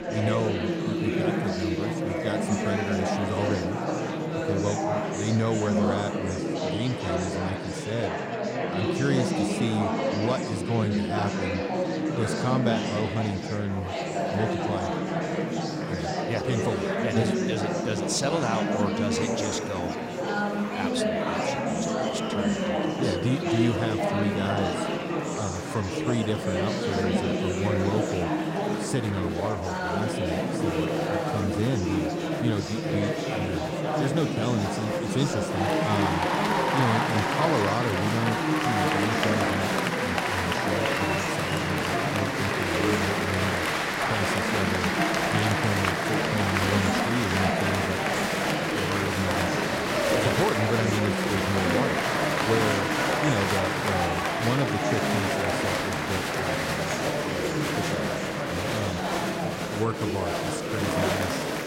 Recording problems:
murmuring crowd; very loud; throughout; 4 dB above the speech

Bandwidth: 16 kHz